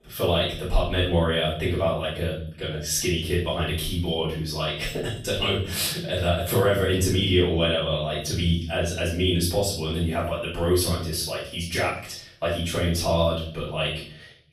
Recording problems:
off-mic speech; far
room echo; noticeable; dies away in 0.6 s

